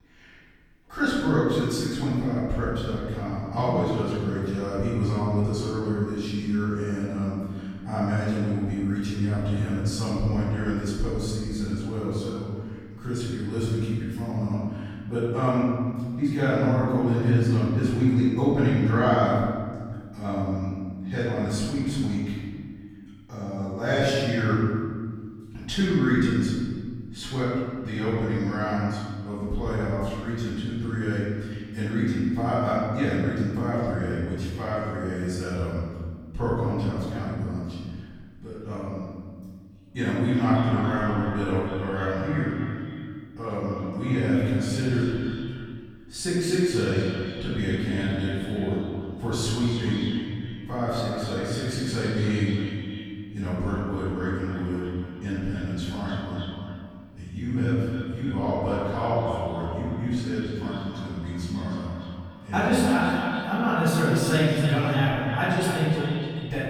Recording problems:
room echo; strong; dies away in 1.9 s
off-mic speech; far
echo of what is said; noticeable; from 40 s on; 290 ms later, 10 dB below the speech

